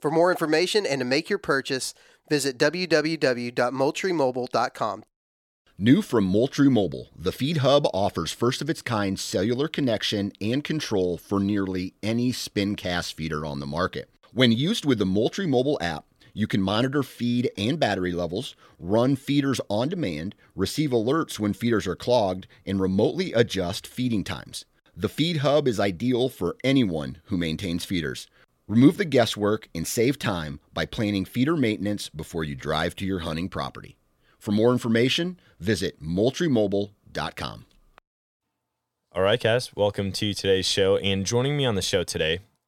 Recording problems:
none

